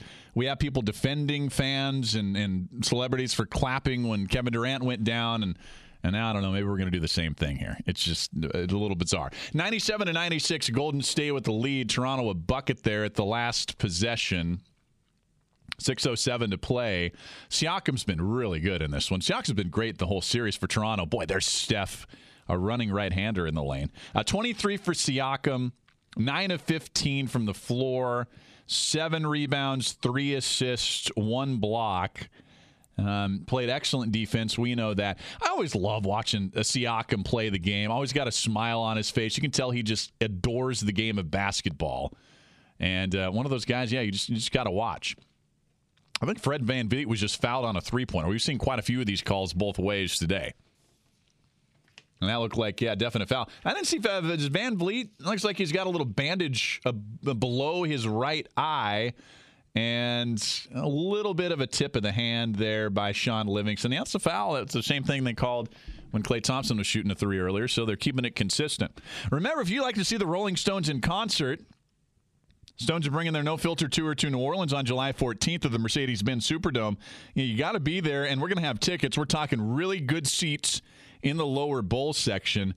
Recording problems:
squashed, flat; somewhat

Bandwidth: 14.5 kHz